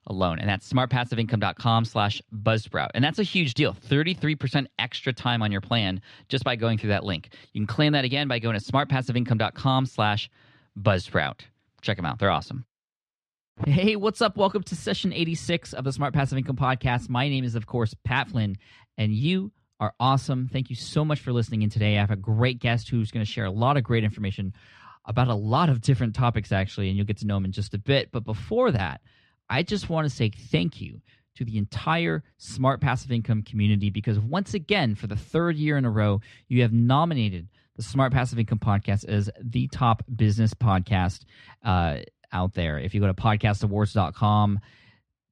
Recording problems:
muffled; very slightly; fading above 3.5 kHz

